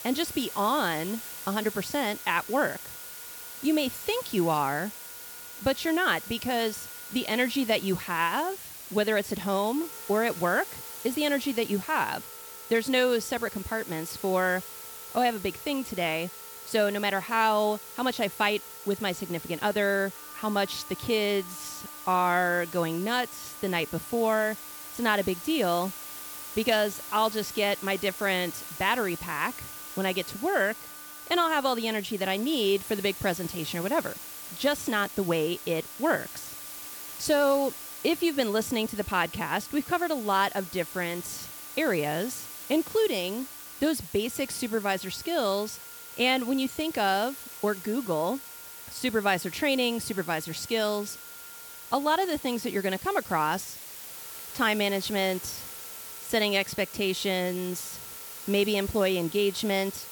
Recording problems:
hiss; noticeable; throughout; 10 dB below the speech
background music; faint; throughout; 25 dB below the speech

